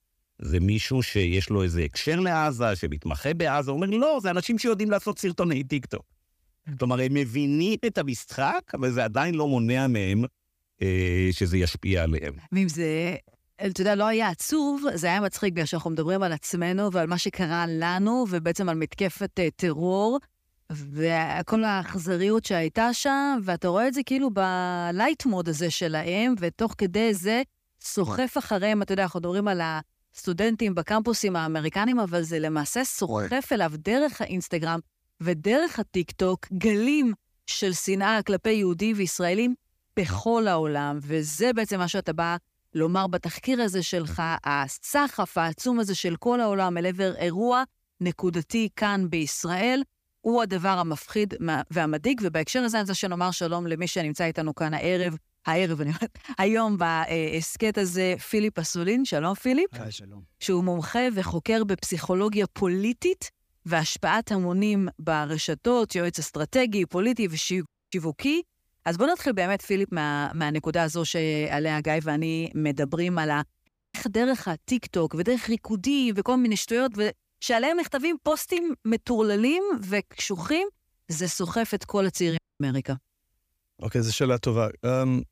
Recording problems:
audio cutting out; at 1:08, at 1:14 and at 1:22

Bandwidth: 15 kHz